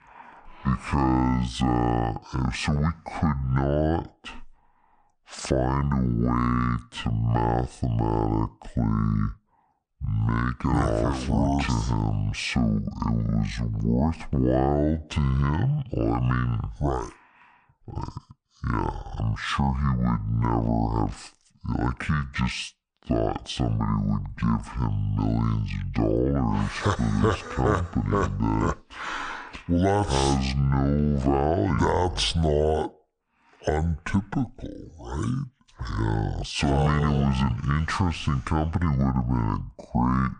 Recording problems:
wrong speed and pitch; too slow and too low; 0.6 times normal speed

